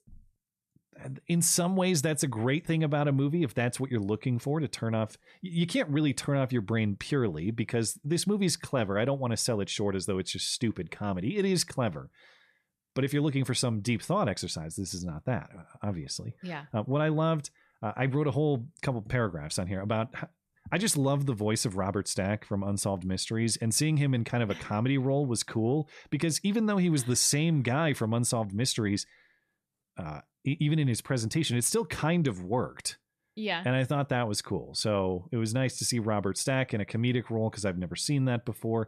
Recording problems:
none

